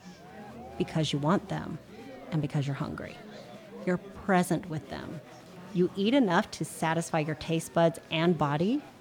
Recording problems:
murmuring crowd; noticeable; throughout; 20 dB below the speech

